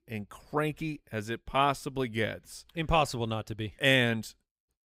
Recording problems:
none

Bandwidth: 15.5 kHz